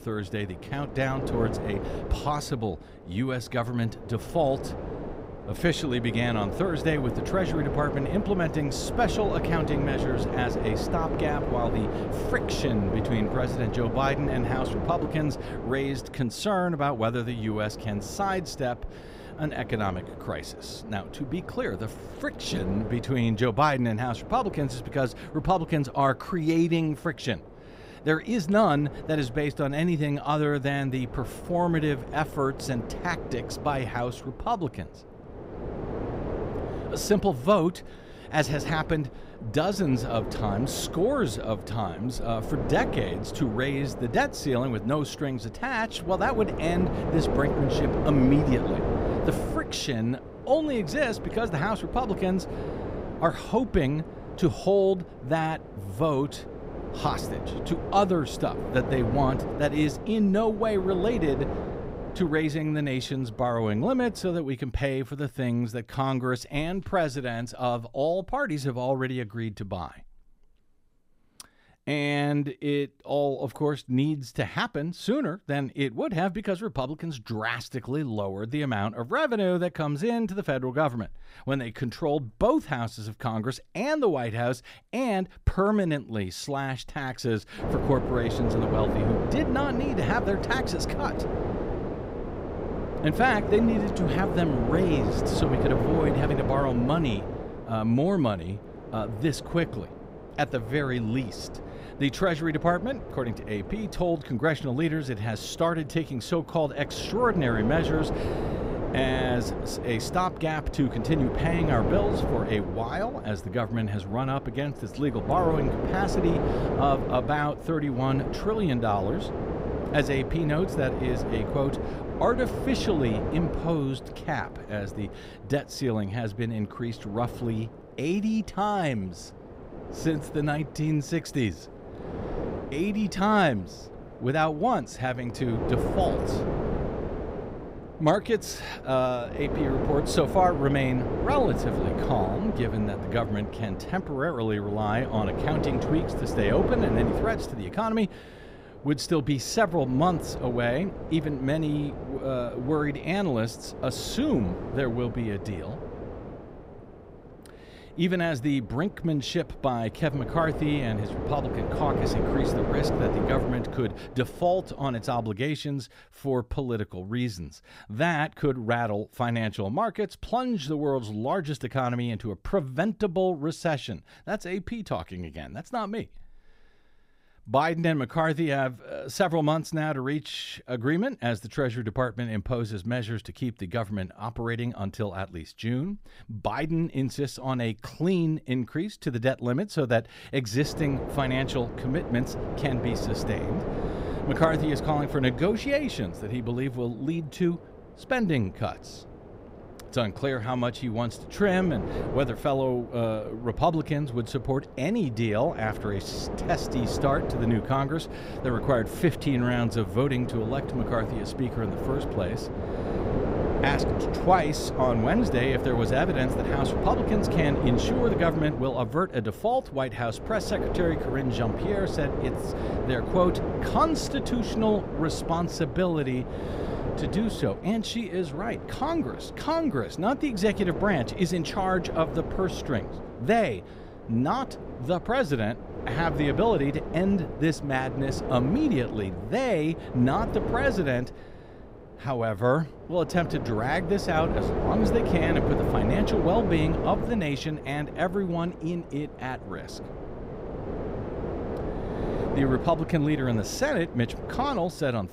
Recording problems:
wind noise on the microphone; heavy; until 1:04, from 1:28 to 2:45 and from 3:11 on; 6 dB below the speech

